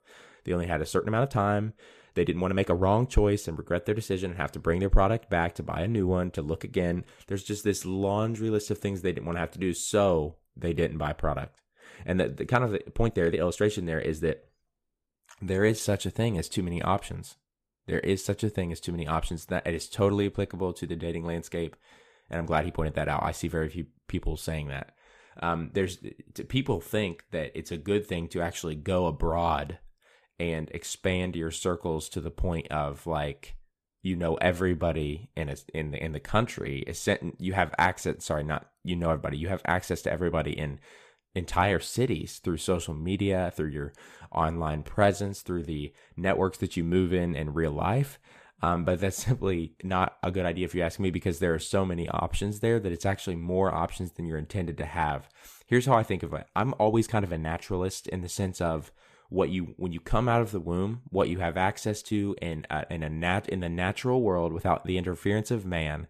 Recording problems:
uneven, jittery; strongly; from 1 s to 1:02

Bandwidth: 14.5 kHz